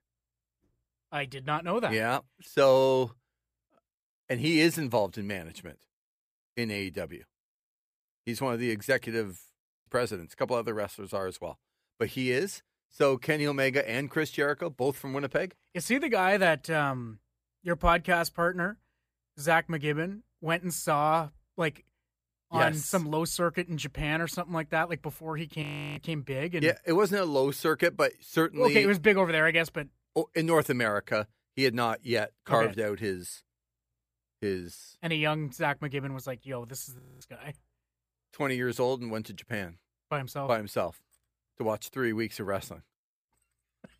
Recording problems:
audio freezing; at 9.5 s, at 26 s and at 37 s

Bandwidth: 15 kHz